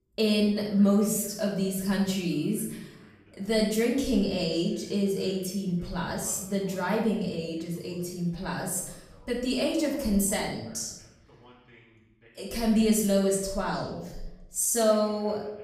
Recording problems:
off-mic speech; far
room echo; noticeable; dies away in 0.7 s
voice in the background; faint; throughout; 30 dB below the speech

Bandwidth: 15 kHz